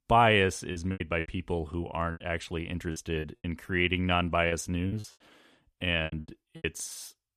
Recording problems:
choppy; very; from 0.5 to 3 s and from 4.5 to 6.5 s; 17% of the speech affected

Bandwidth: 14.5 kHz